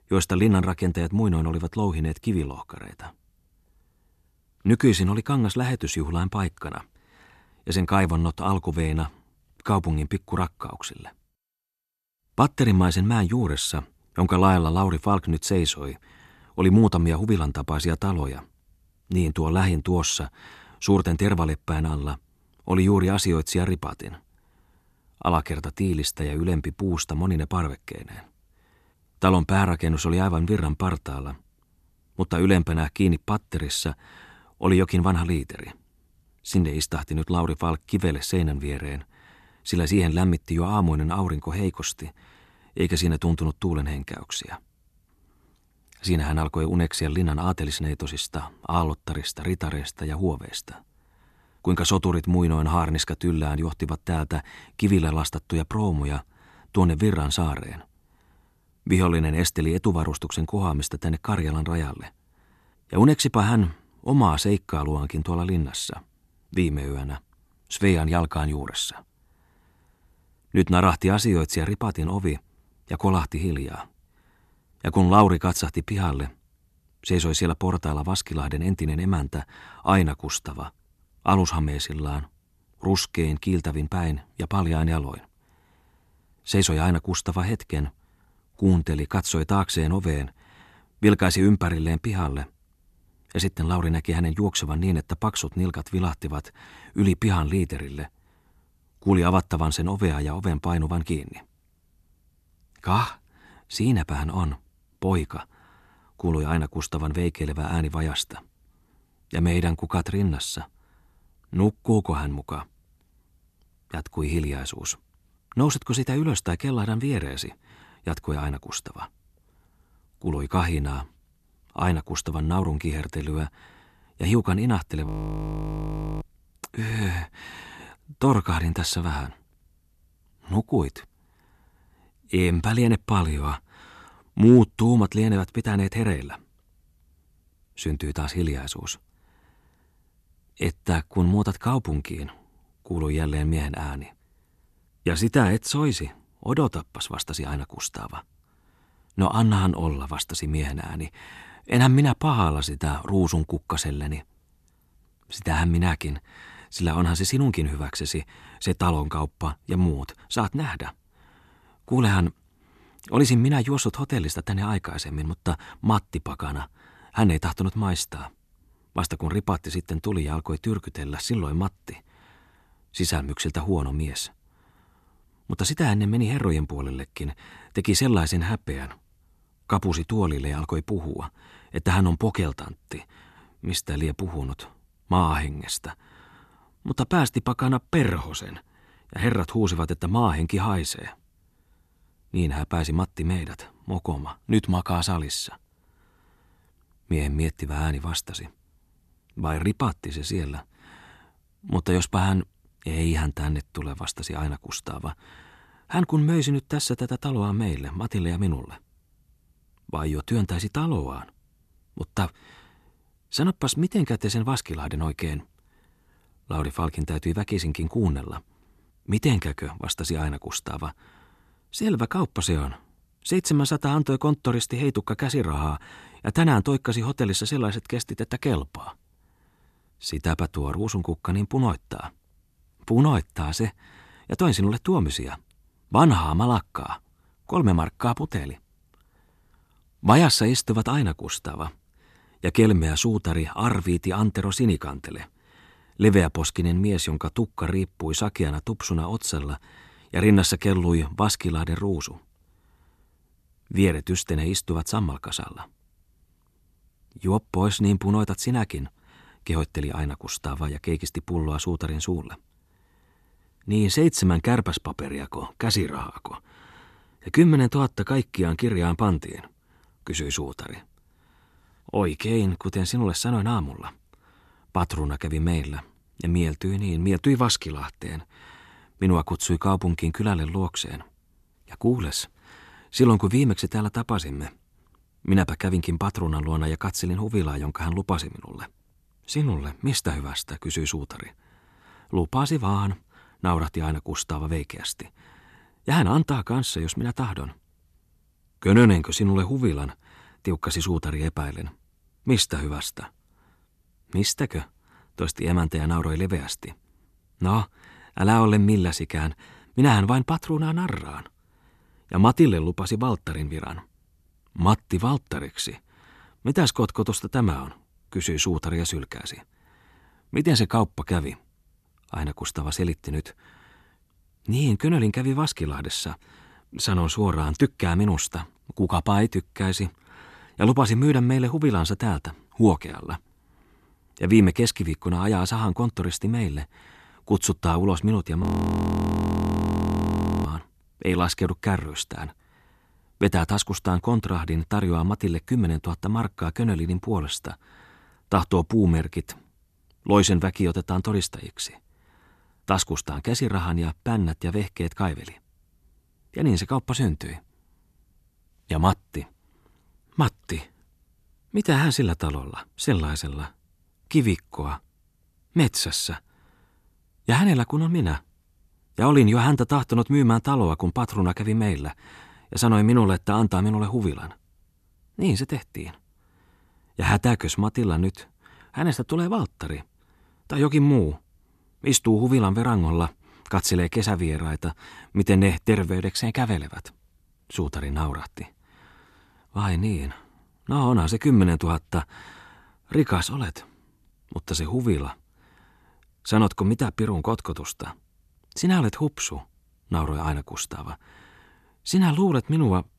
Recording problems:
audio freezing; at 2:05 for 1 s and at 5:38 for 2 s

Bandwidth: 13.5 kHz